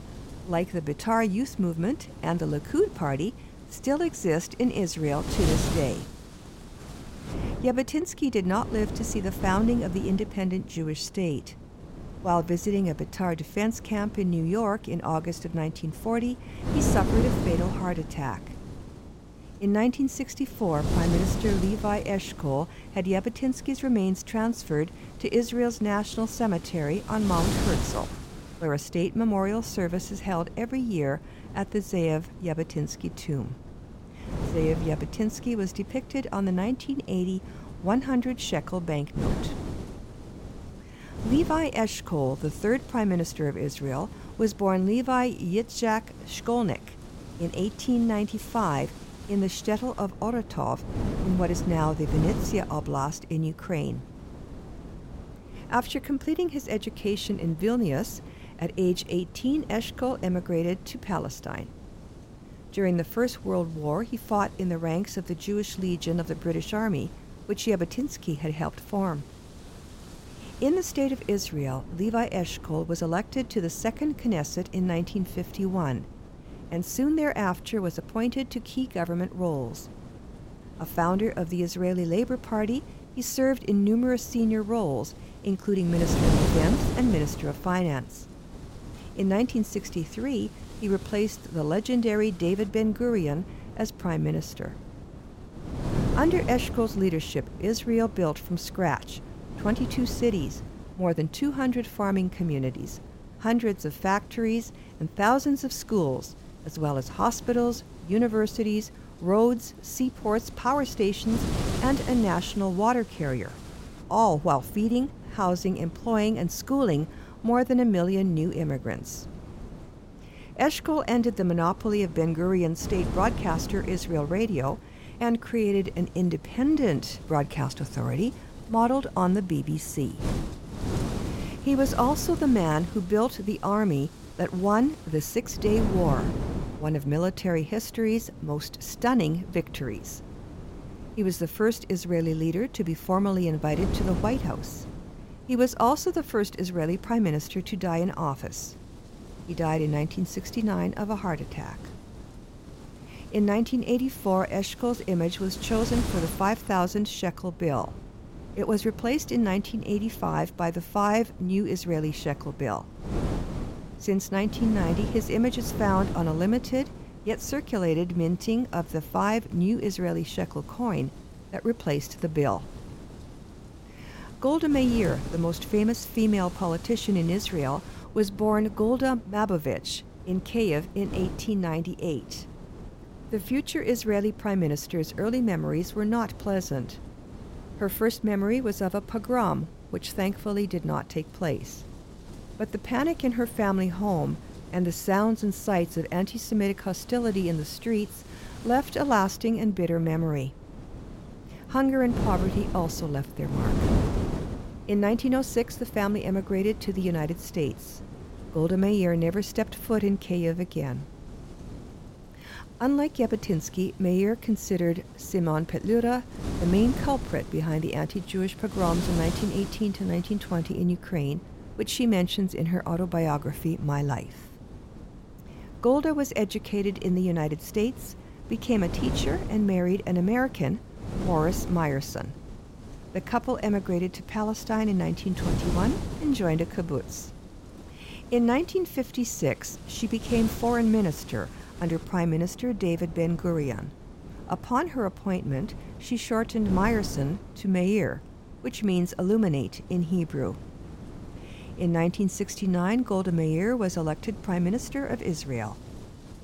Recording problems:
wind noise on the microphone; occasional gusts; 15 dB below the speech

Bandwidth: 16 kHz